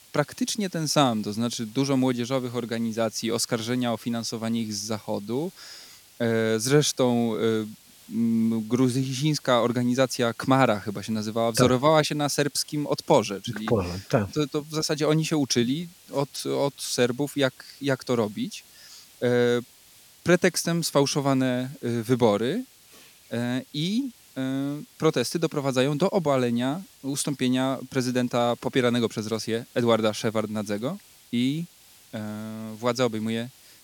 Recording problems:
hiss; faint; throughout; 25 dB below the speech

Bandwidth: 17.5 kHz